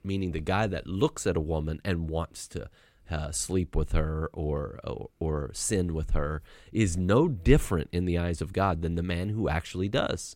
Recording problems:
none

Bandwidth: 16 kHz